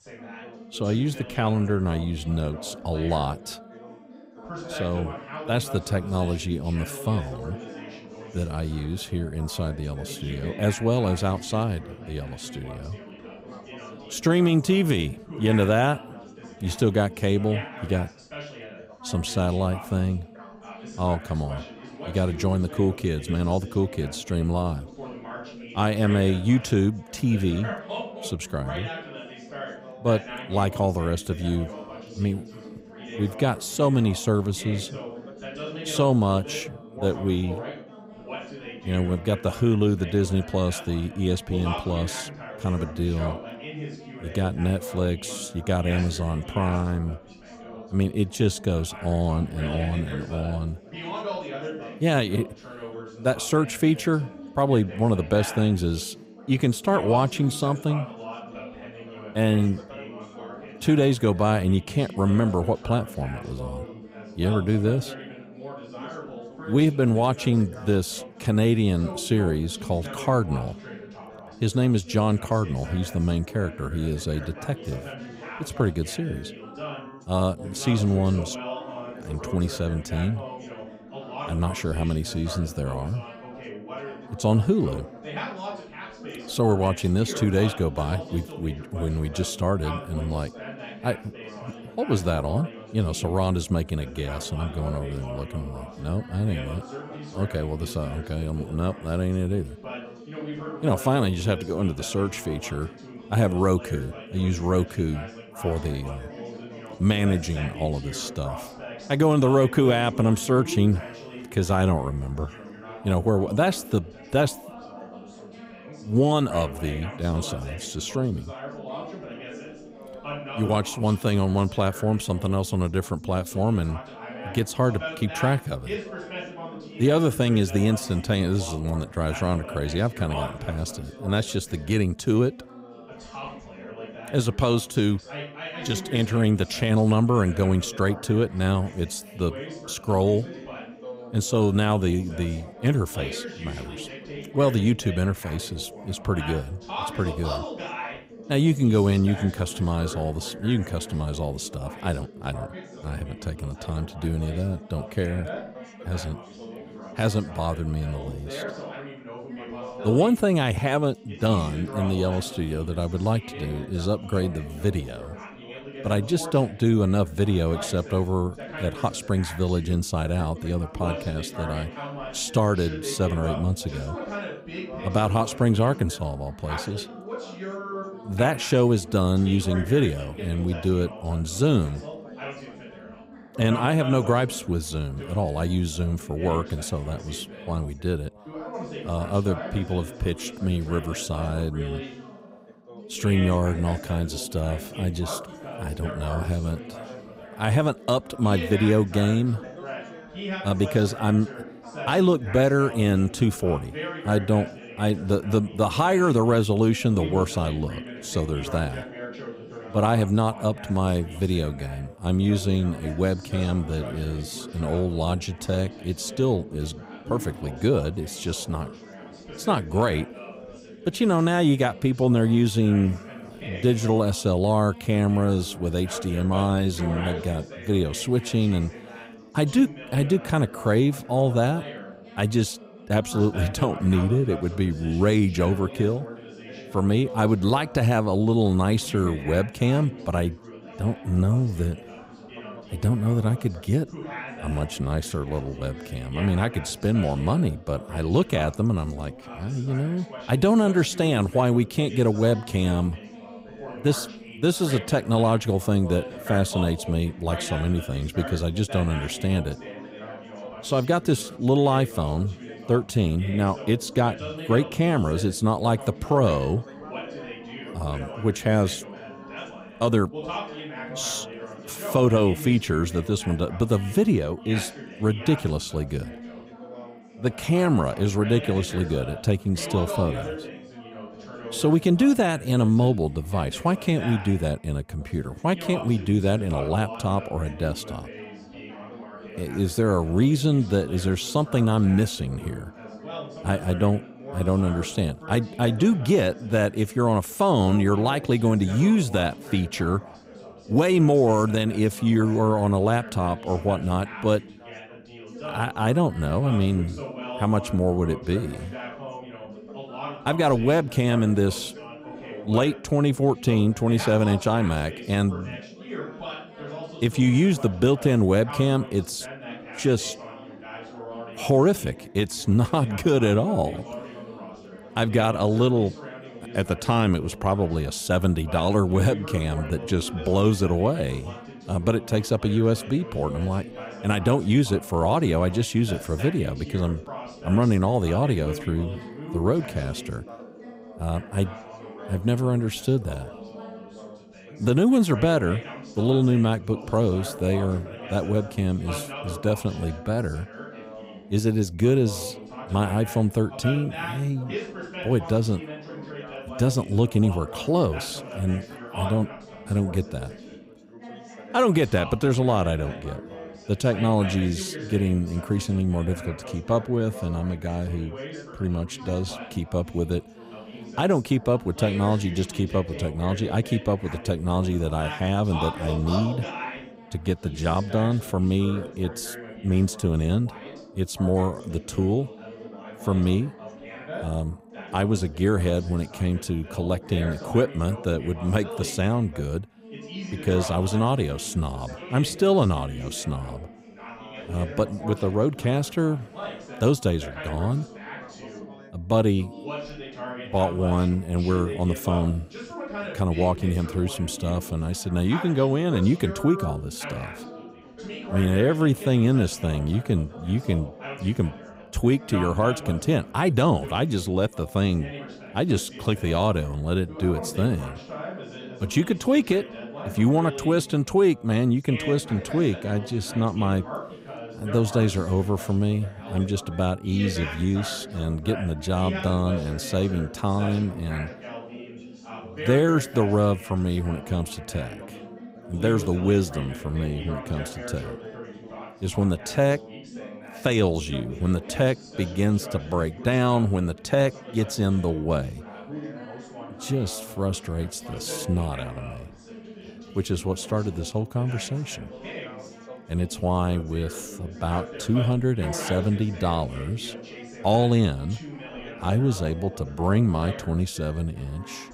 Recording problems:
background chatter; noticeable; throughout; 3 voices, 15 dB below the speech

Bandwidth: 15.5 kHz